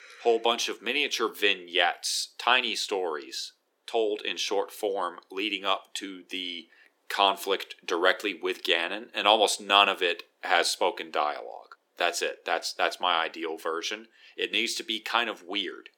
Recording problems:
thin; very; fading below 350 Hz

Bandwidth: 17 kHz